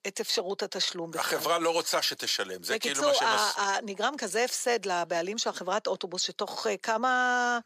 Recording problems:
thin; very; fading below 650 Hz

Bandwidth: 15 kHz